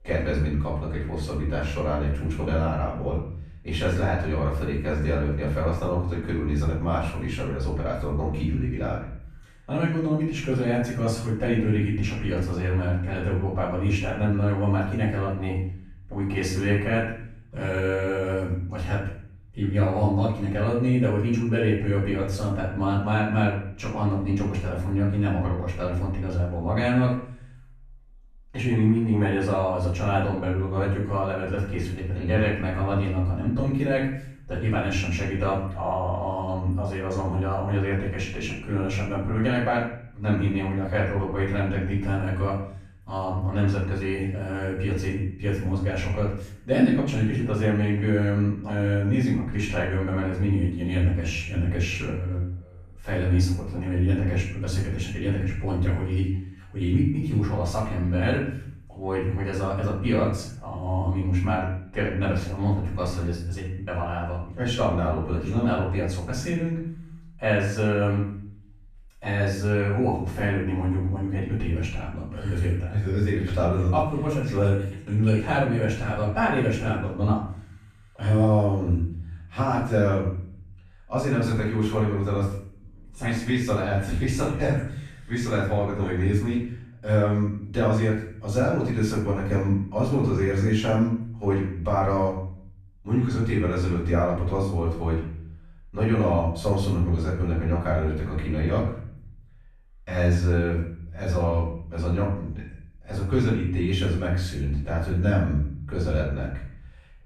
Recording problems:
off-mic speech; far
room echo; noticeable; dies away in 0.6 s

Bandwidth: 14.5 kHz